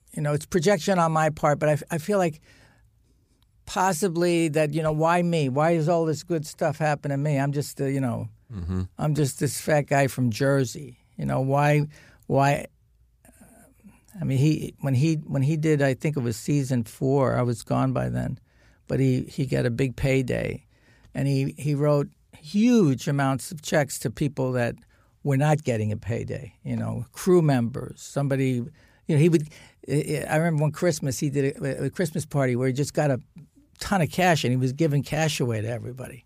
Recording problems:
none

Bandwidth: 15 kHz